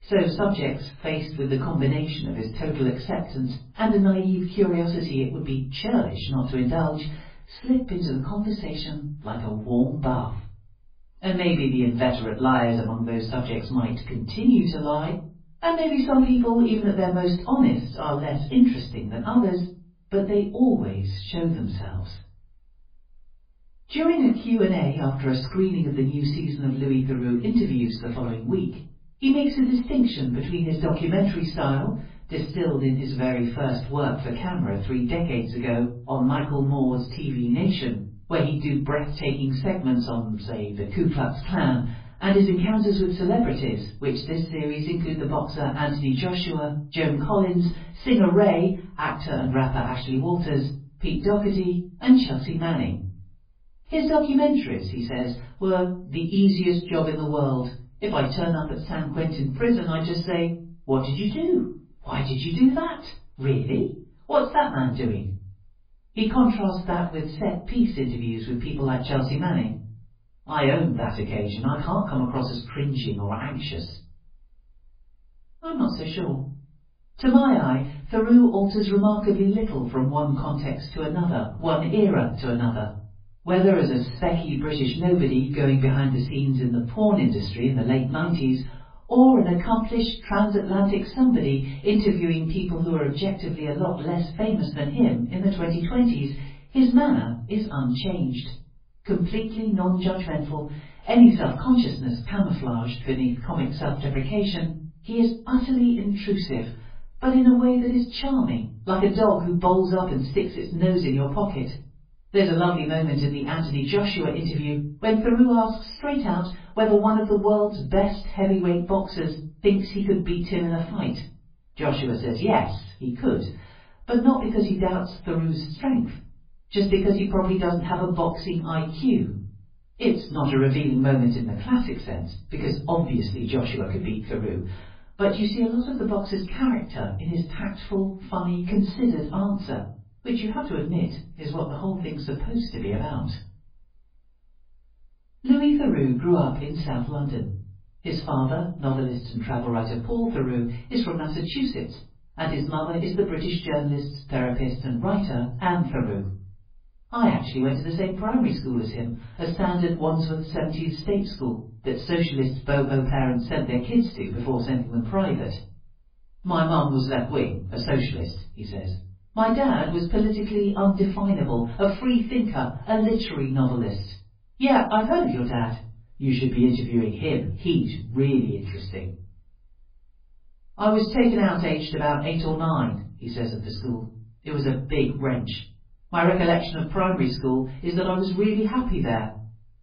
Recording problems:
off-mic speech; far
garbled, watery; badly; nothing above 11.5 kHz
room echo; slight; dies away in 0.4 s

